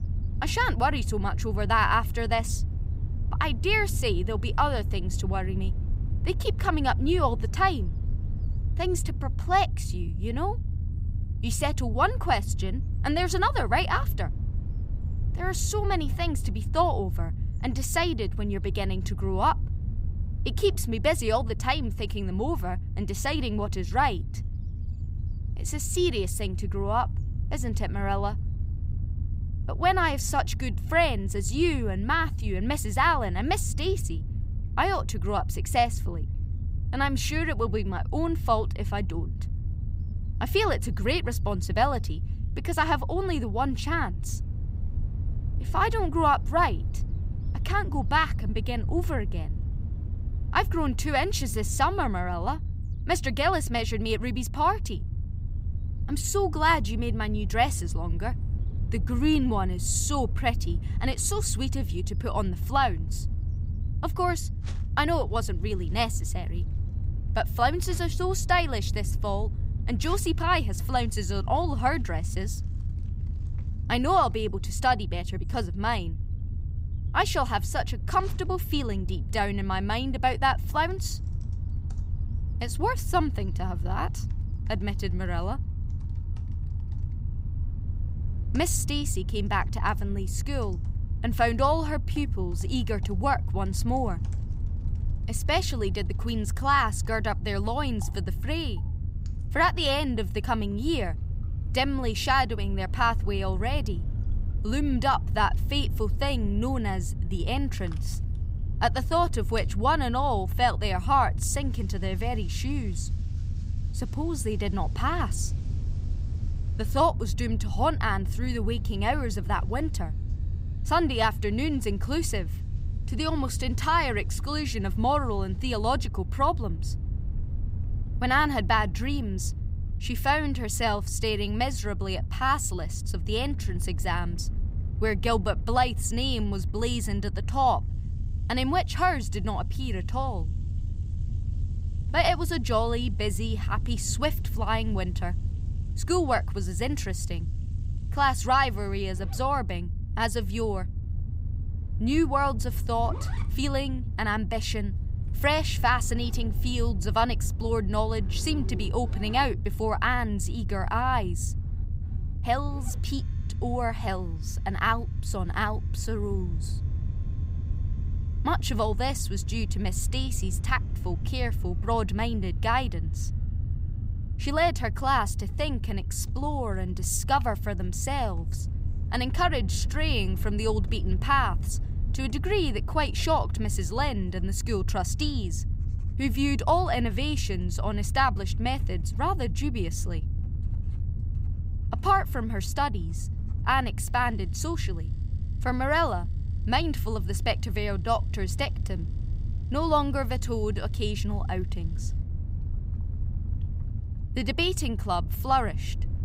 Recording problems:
household noises; faint; from 1:03 on; 30 dB below the speech
low rumble; faint; throughout; 20 dB below the speech

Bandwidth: 15.5 kHz